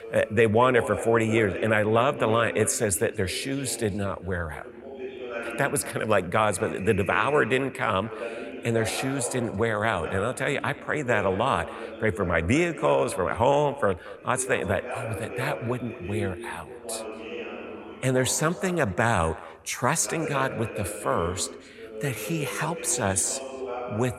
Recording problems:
echo of what is said; noticeable; throughout; 230 ms later, 20 dB below the speech
voice in the background; noticeable; throughout; 10 dB below the speech

